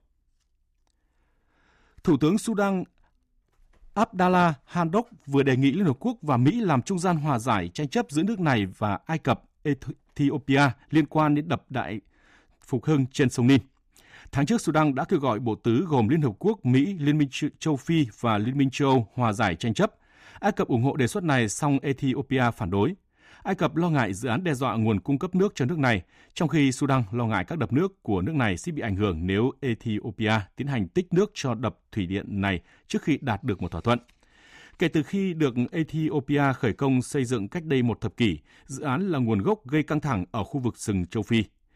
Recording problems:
none

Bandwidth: 15 kHz